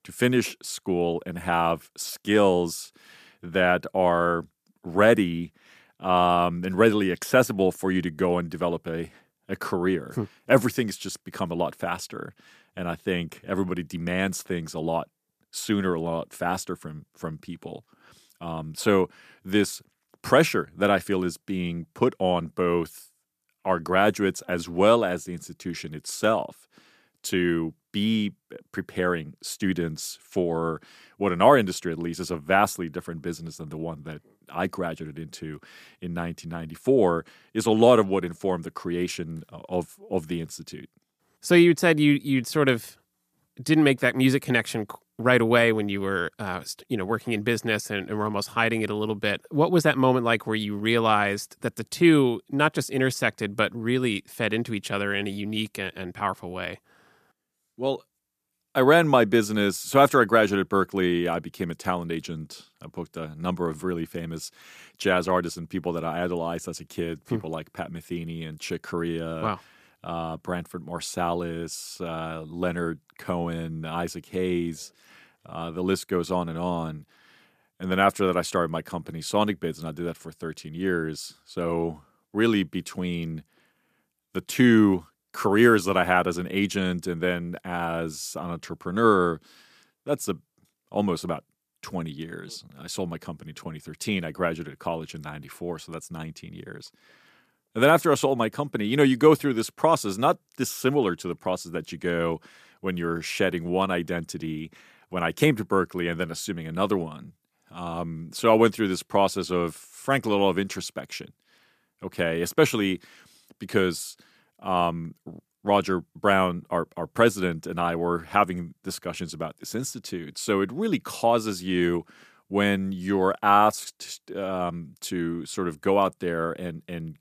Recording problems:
none

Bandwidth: 14.5 kHz